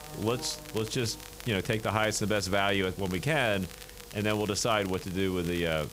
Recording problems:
hiss; noticeable; throughout; 20 dB below the speech
crackle, like an old record; noticeable; 20 dB below the speech
electrical hum; faint; throughout; 50 Hz, 20 dB below the speech

